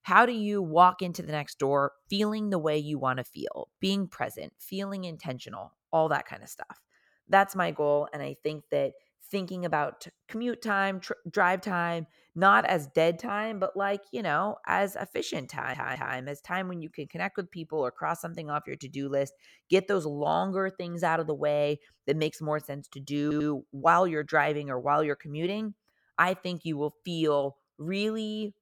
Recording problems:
audio stuttering; at 16 s and at 23 s

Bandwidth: 17 kHz